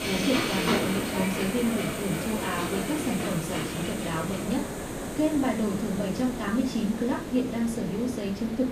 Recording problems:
off-mic speech; far
room echo; slight; dies away in 0.3 s
train or aircraft noise; loud; throughout; 3 dB below the speech
hiss; loud; throughout; 6 dB below the speech
voice in the background; faint; throughout; 20 dB below the speech

